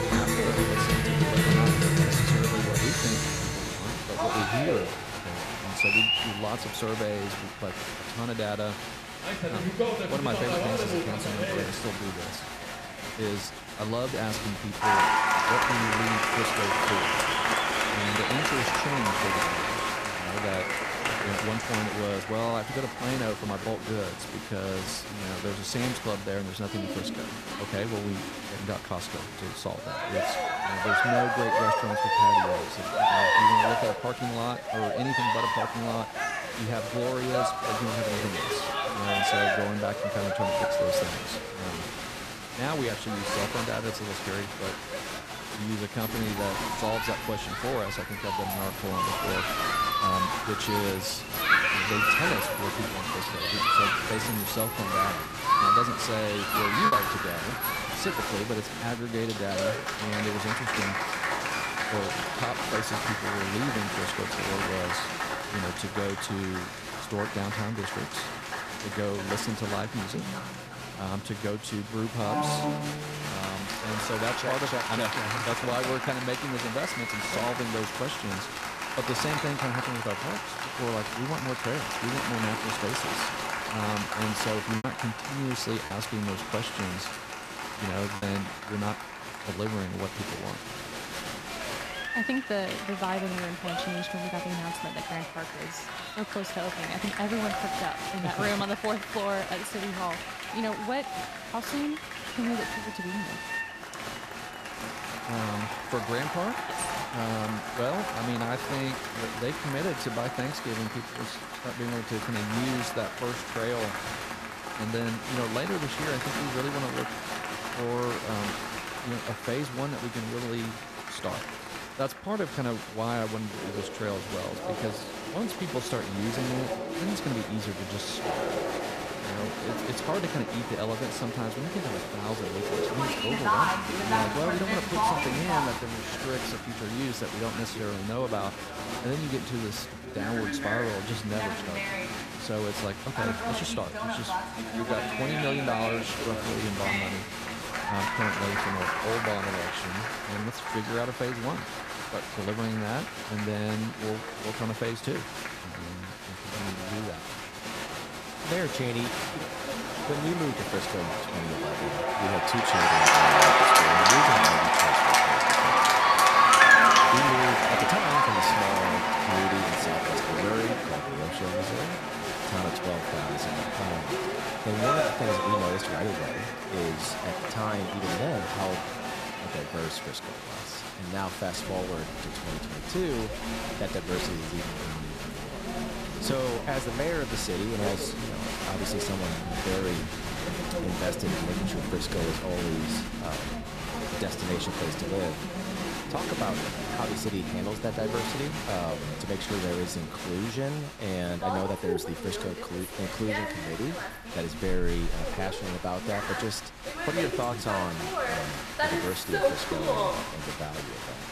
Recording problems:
crowd noise; very loud; throughout; 5 dB above the speech
abrupt cut into speech; at the start
choppy; occasionally; at 57 s and from 1:25 to 1:28; 4% of the speech affected

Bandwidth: 14.5 kHz